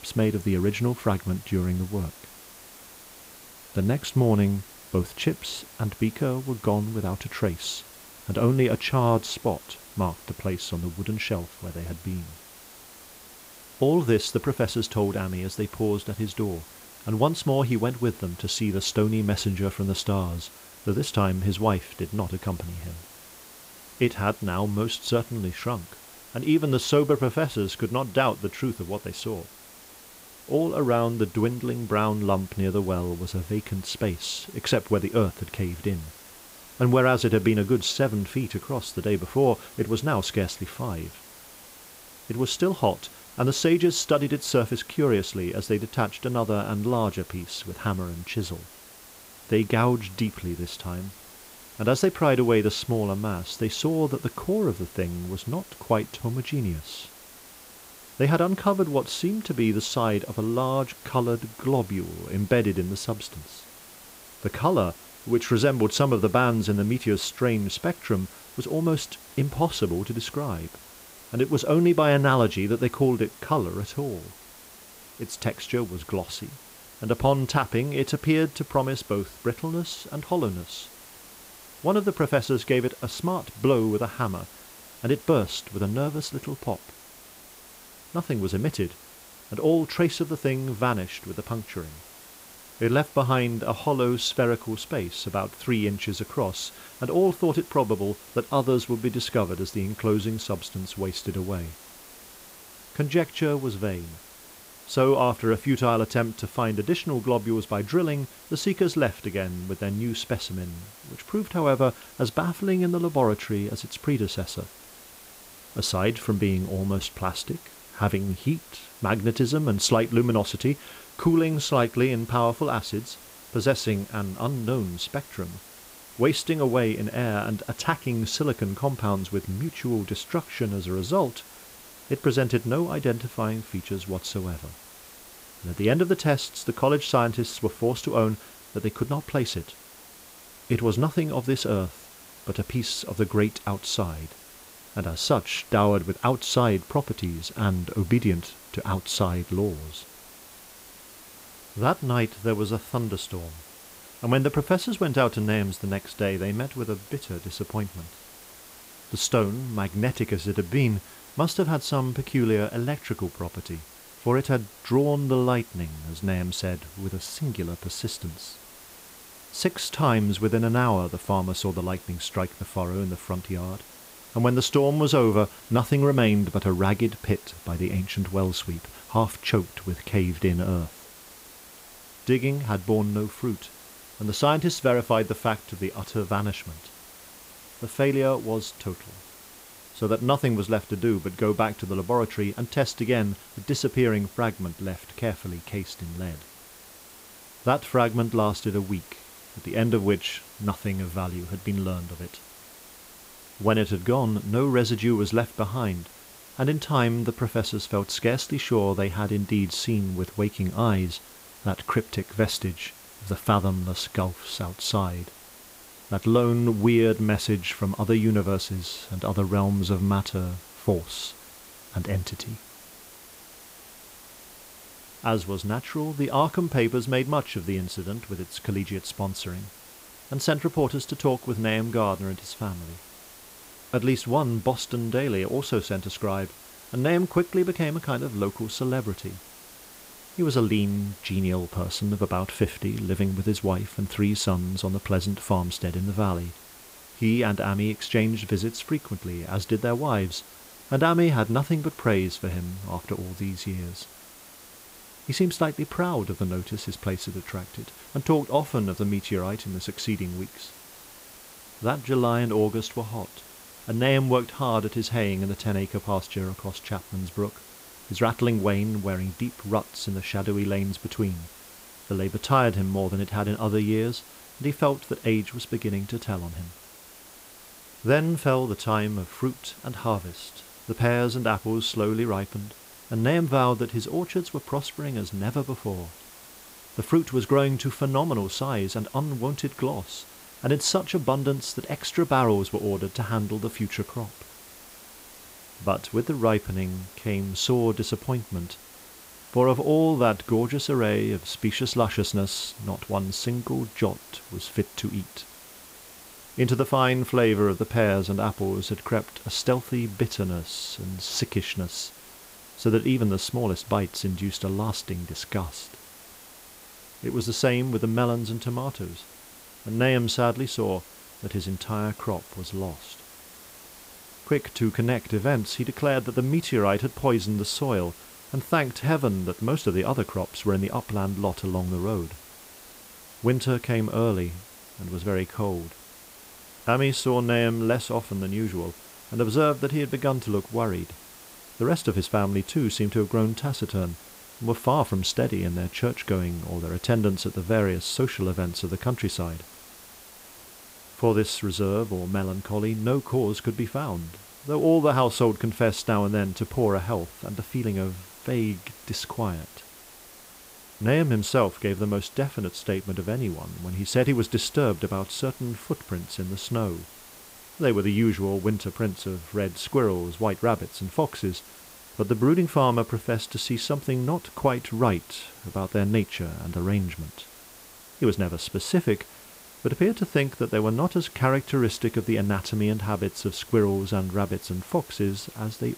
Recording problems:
hiss; noticeable; throughout; 20 dB below the speech

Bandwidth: 15.5 kHz